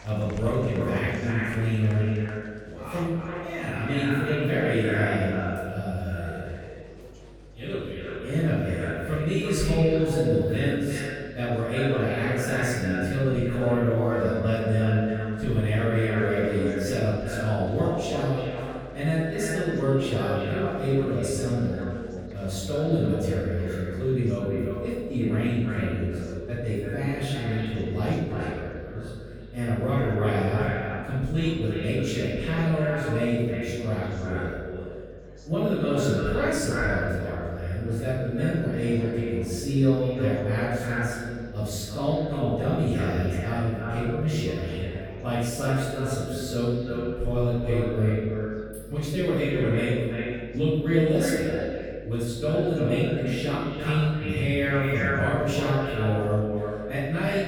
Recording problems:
echo of what is said; strong; throughout; 340 ms later, 7 dB below the speech
room echo; strong; dies away in 1.4 s
off-mic speech; far
electrical hum; faint; throughout; 50 Hz, 25 dB below the speech
murmuring crowd; faint; throughout; 25 dB below the speech

